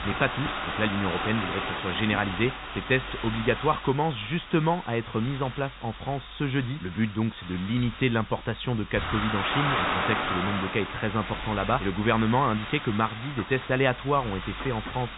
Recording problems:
high frequencies cut off; severe; nothing above 4 kHz
hiss; loud; throughout; 5 dB below the speech

